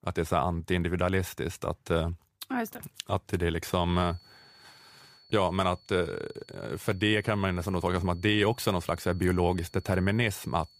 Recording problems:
high-pitched whine; faint; from 4 s on; 4.5 kHz, 25 dB below the speech

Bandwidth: 15 kHz